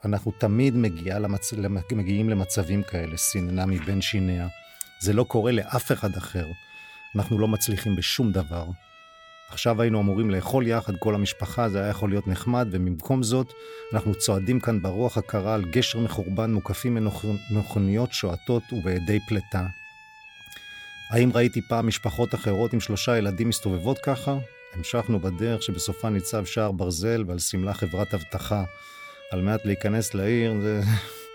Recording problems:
background music; noticeable; throughout; 20 dB below the speech

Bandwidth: 18.5 kHz